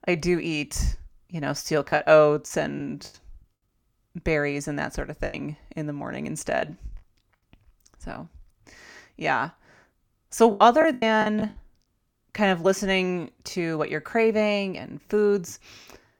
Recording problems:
choppy; very; from 2 to 3 s, from 5.5 to 7 s and at 11 s; 11% of the speech affected

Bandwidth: 18.5 kHz